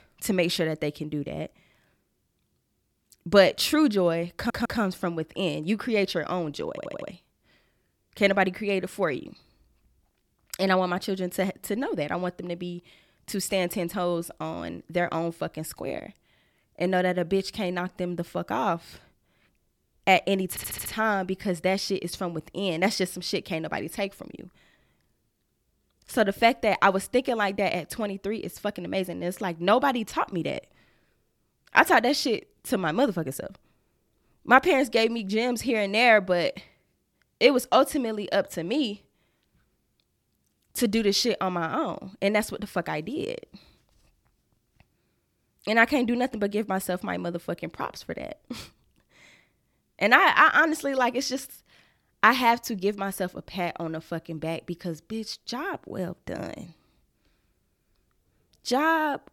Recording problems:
audio stuttering; at 4.5 s, at 6.5 s and at 21 s

